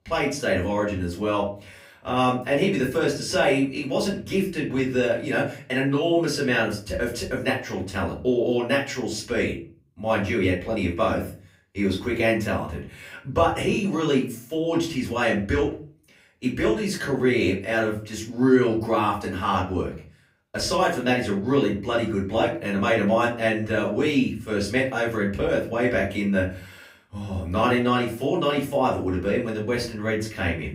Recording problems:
off-mic speech; far
room echo; slight; dies away in 0.4 s

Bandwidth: 15.5 kHz